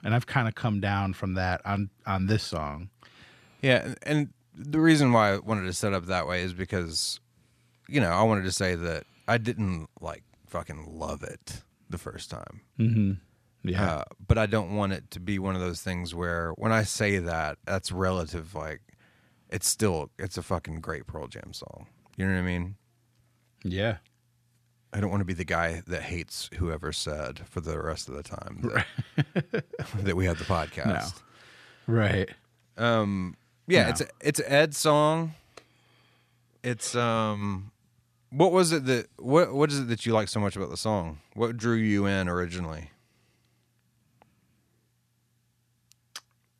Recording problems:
none

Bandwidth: 14 kHz